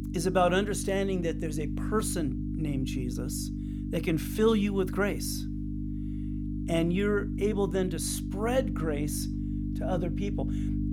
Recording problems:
electrical hum; loud; throughout; 50 Hz, 9 dB below the speech

